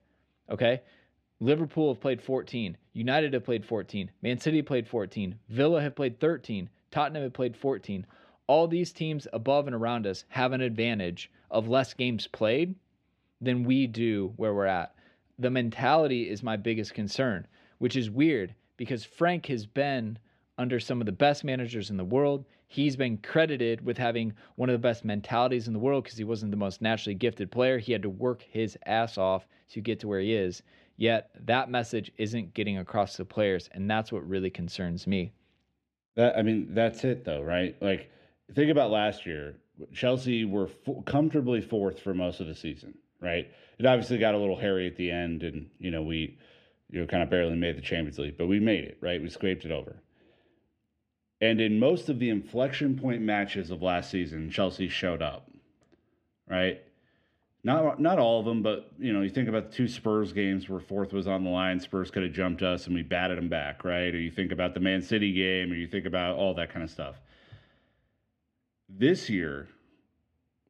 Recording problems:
muffled; slightly; fading above 3.5 kHz

